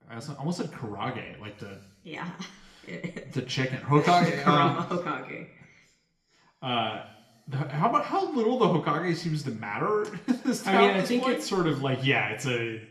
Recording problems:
room echo; slight; dies away in 0.6 s
off-mic speech; somewhat distant

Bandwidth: 13.5 kHz